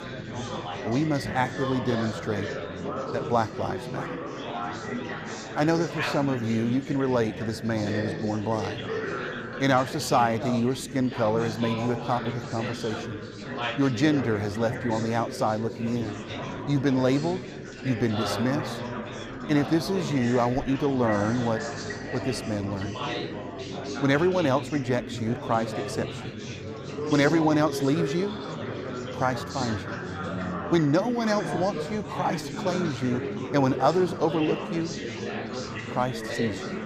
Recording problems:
chatter from many people; loud; throughout; 6 dB below the speech

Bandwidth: 15 kHz